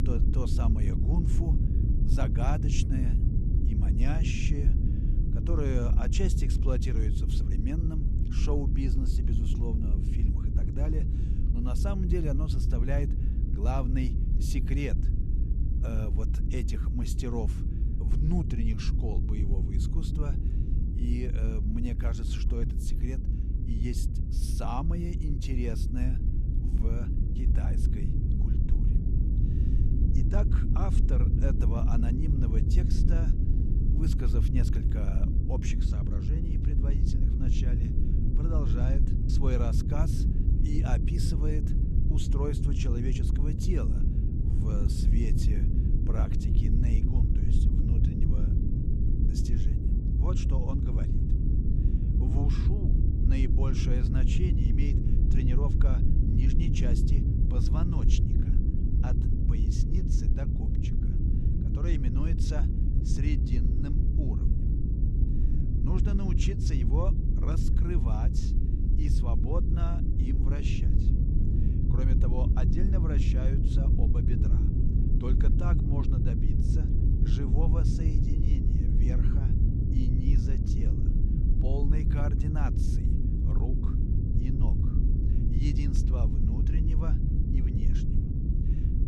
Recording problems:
low rumble; loud; throughout; as loud as the speech

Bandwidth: 13.5 kHz